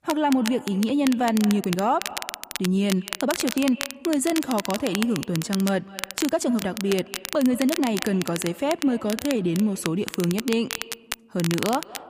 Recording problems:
echo of what is said; faint; throughout; 200 ms later, 20 dB below the speech
crackle, like an old record; loud; 9 dB below the speech
uneven, jittery; strongly; from 1.5 to 10 s

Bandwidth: 15 kHz